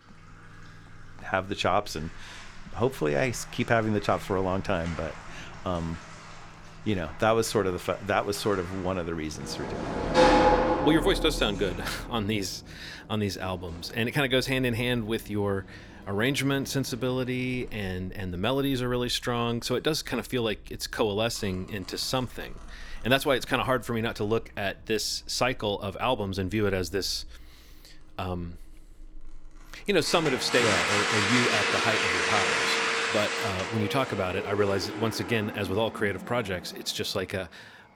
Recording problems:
household noises; very loud; throughout; 1 dB above the speech

